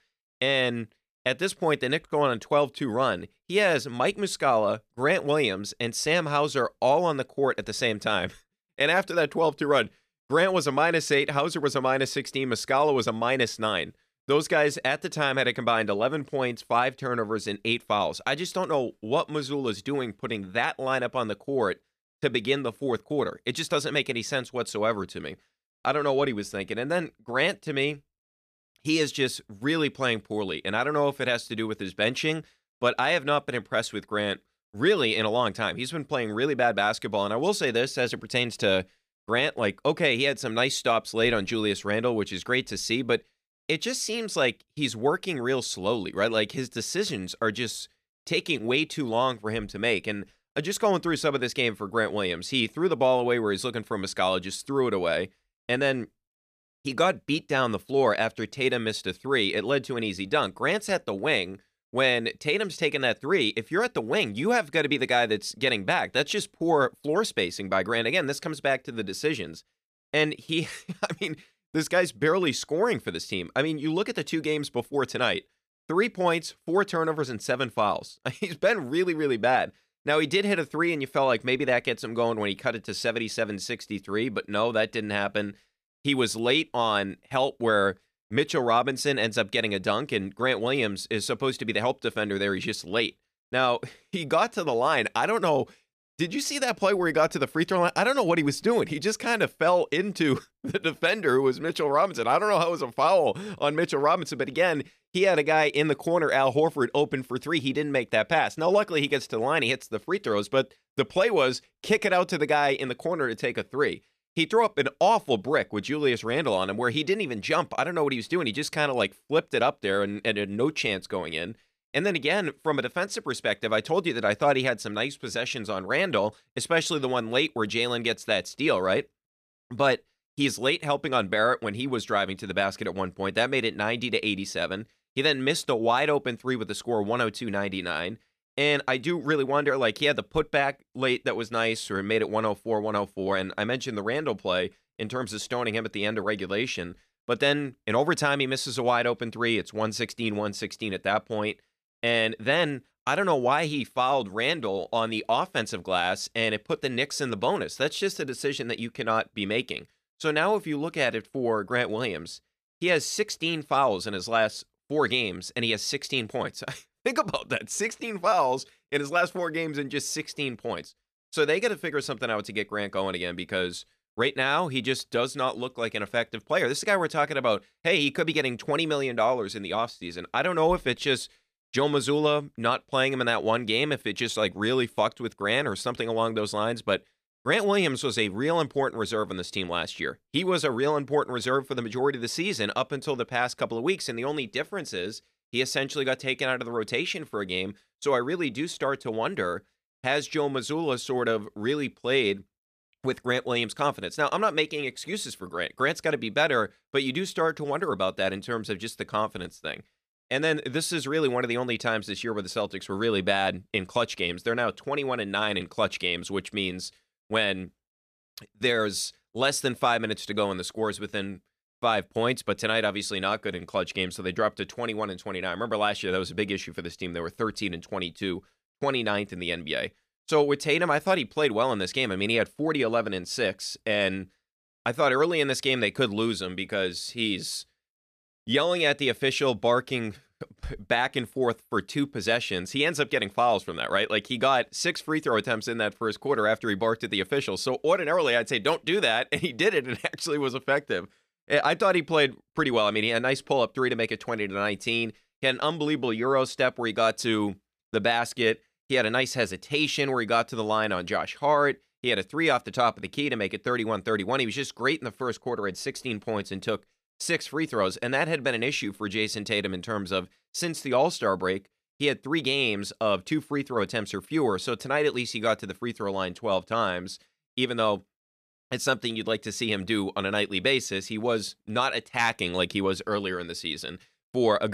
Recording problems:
abrupt cut into speech; at the end

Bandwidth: 14.5 kHz